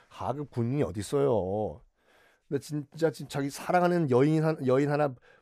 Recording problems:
none

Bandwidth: 15 kHz